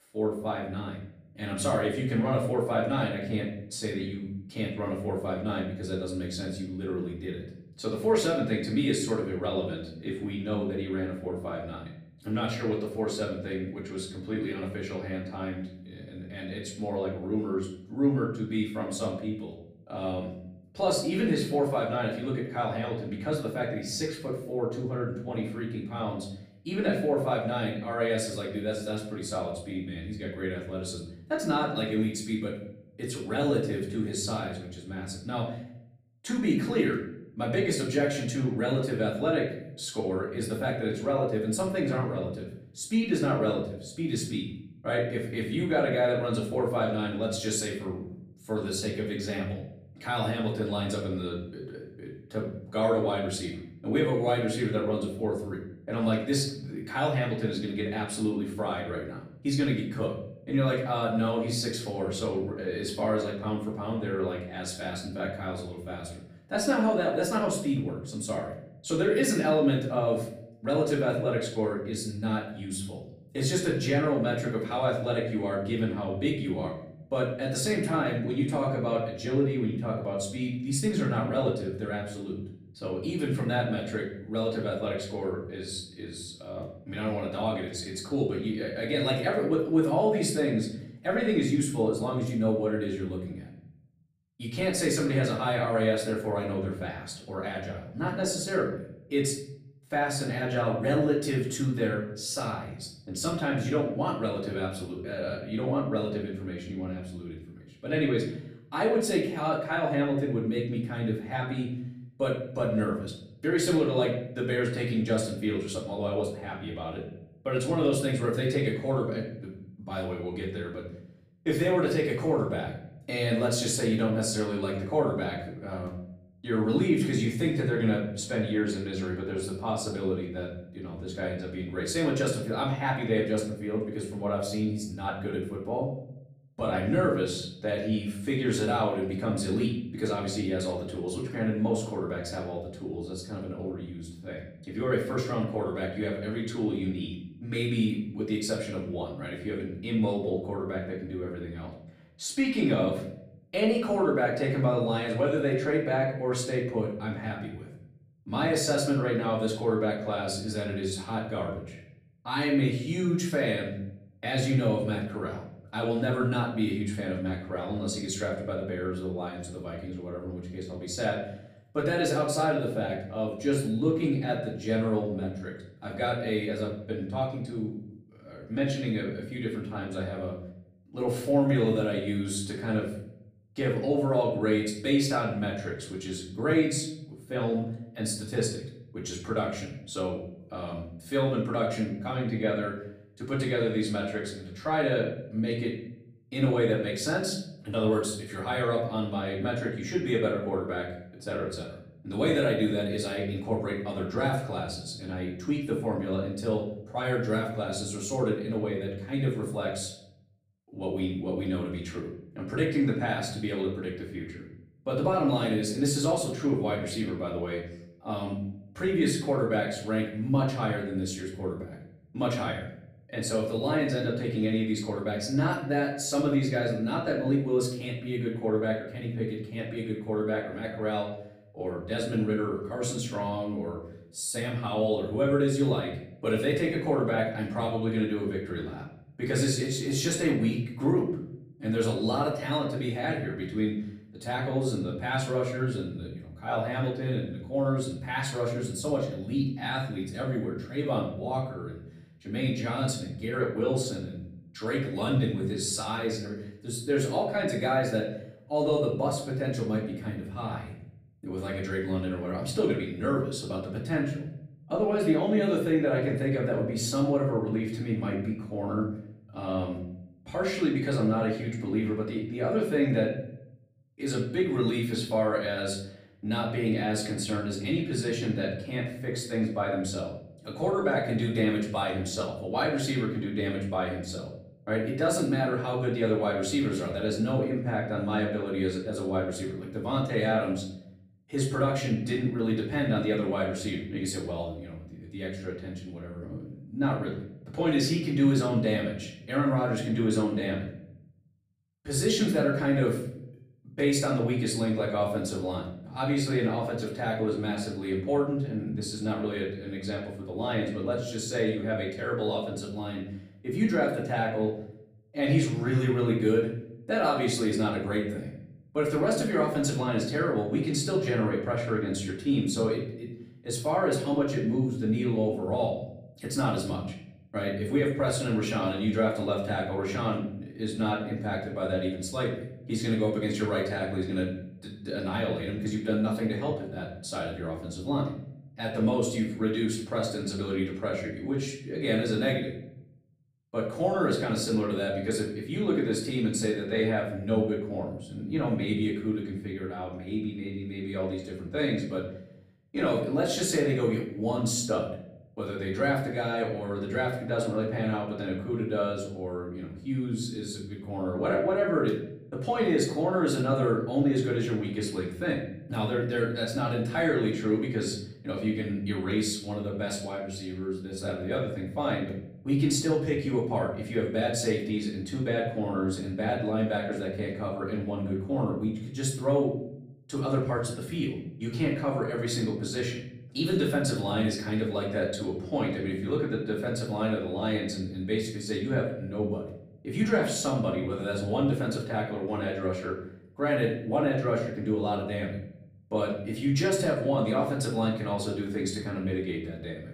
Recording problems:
off-mic speech; far
room echo; slight; dies away in 0.7 s

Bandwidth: 15 kHz